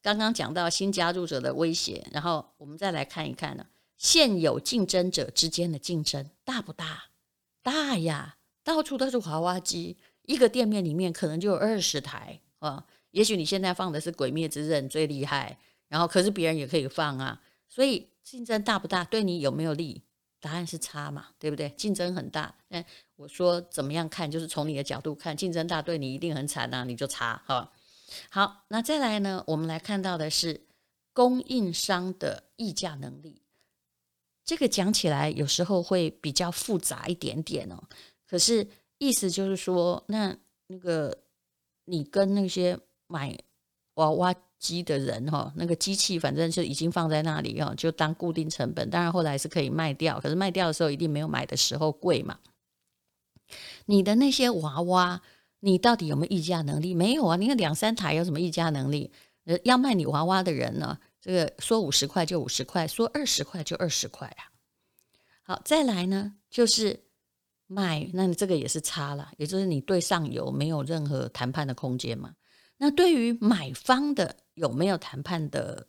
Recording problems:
none

